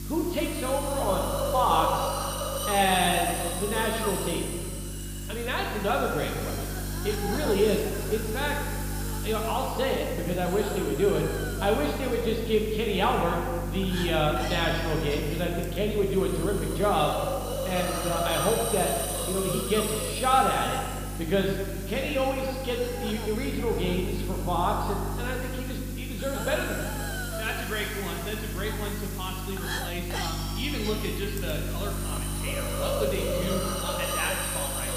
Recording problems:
room echo; noticeable; dies away in 1.5 s
high frequencies cut off; noticeable; nothing above 5 kHz
off-mic speech; somewhat distant
hiss; loud; throughout; 6 dB below the speech
electrical hum; noticeable; throughout; 50 Hz, 20 dB below the speech

